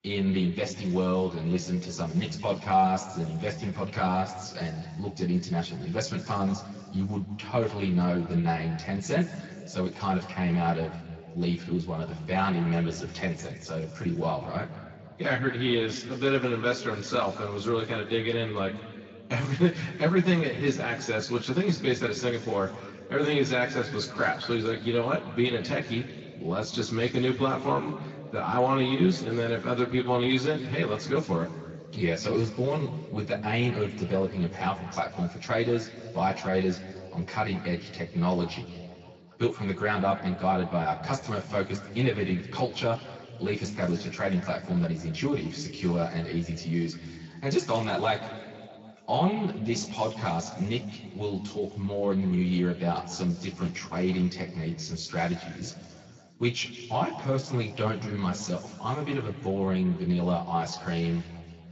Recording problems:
off-mic speech; far
room echo; noticeable; dies away in 1.9 s
garbled, watery; slightly; nothing above 7.5 kHz
high frequencies cut off; slight

